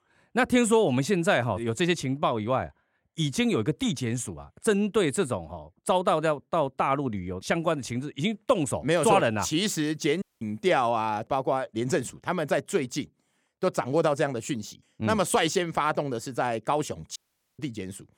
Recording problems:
audio cutting out; at 10 s and at 17 s

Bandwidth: 18 kHz